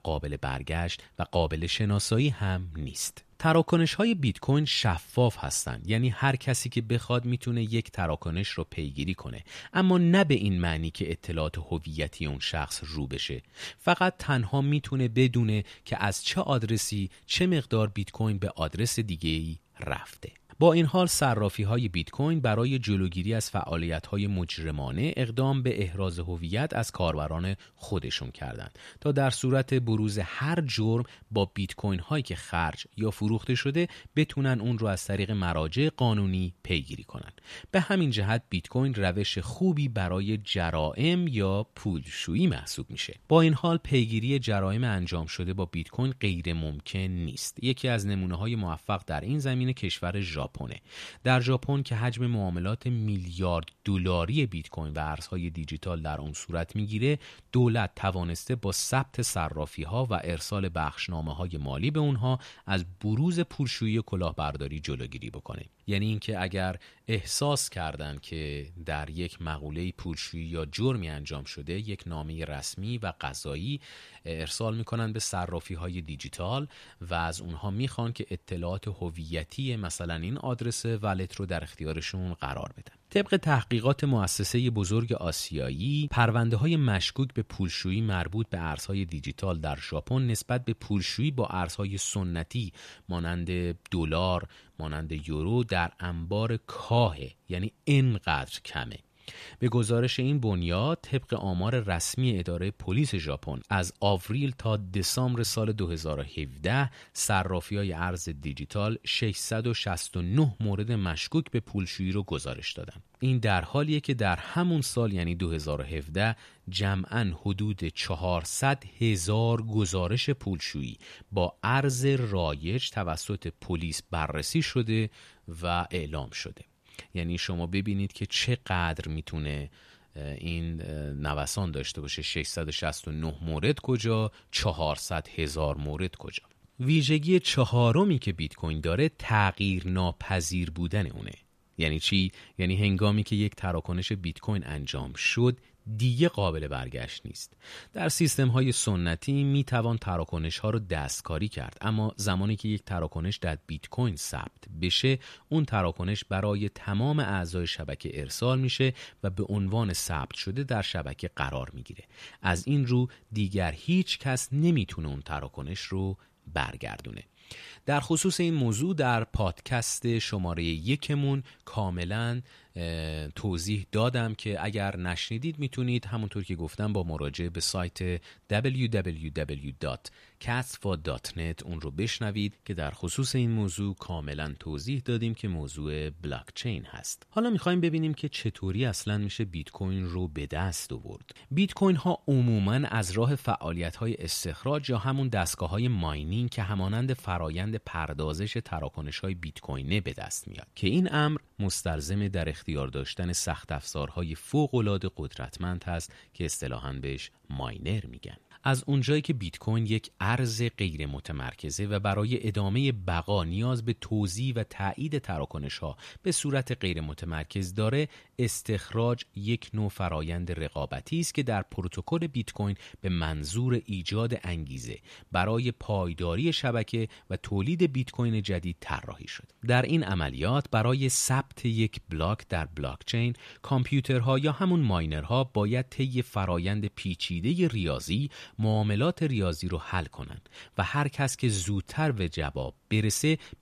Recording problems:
none

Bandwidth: 14.5 kHz